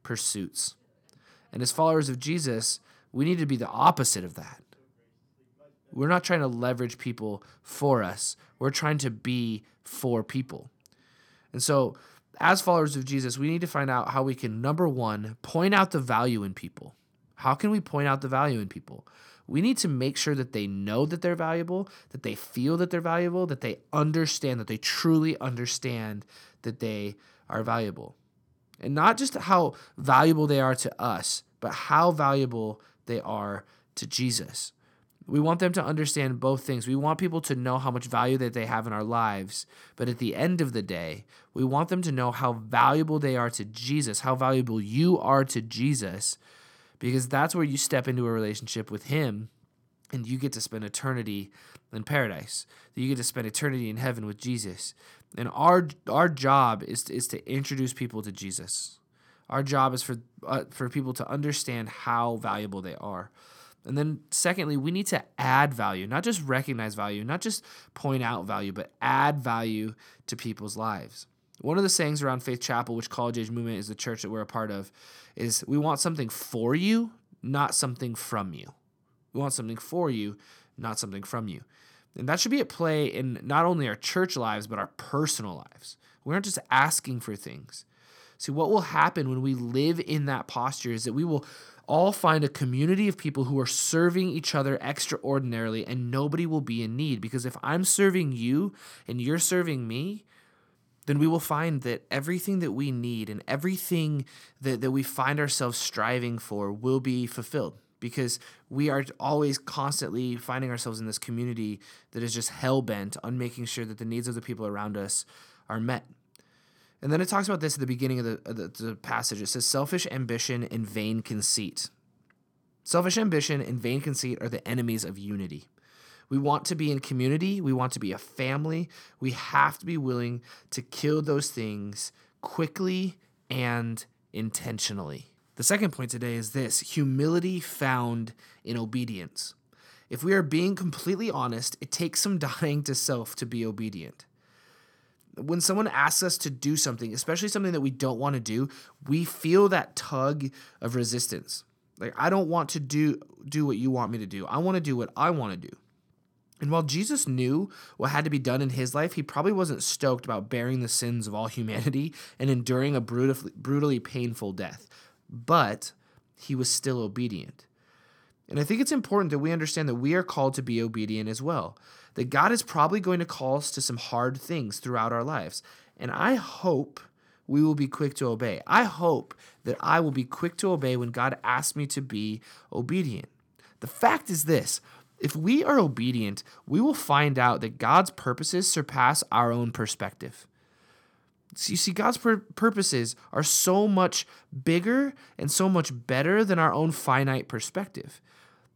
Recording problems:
none

